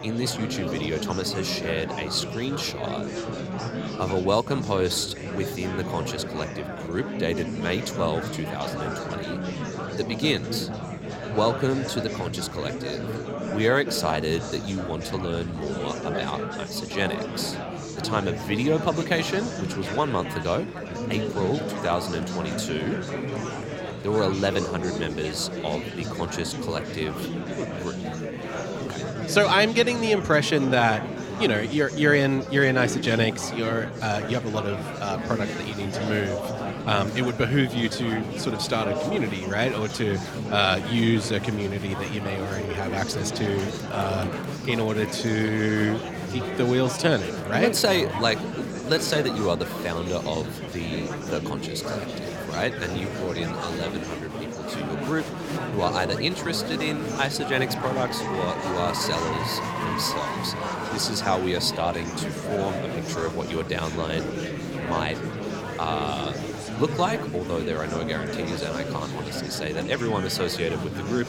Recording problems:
murmuring crowd; loud; throughout; 5 dB below the speech

